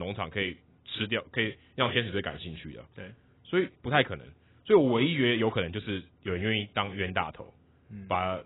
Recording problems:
garbled, watery; badly; nothing above 3.5 kHz
abrupt cut into speech; at the start

